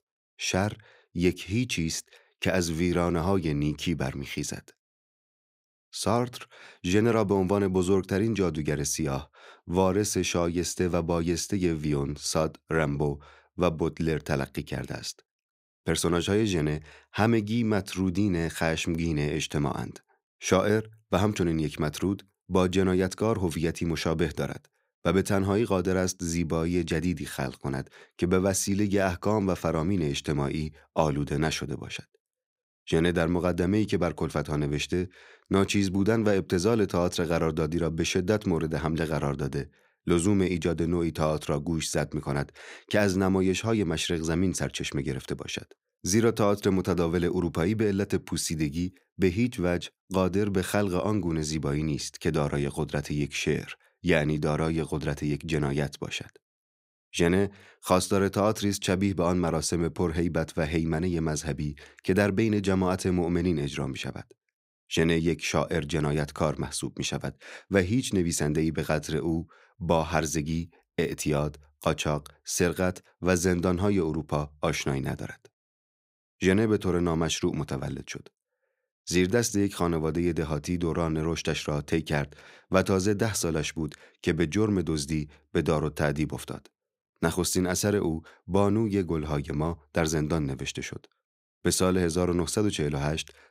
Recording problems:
none

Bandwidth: 15.5 kHz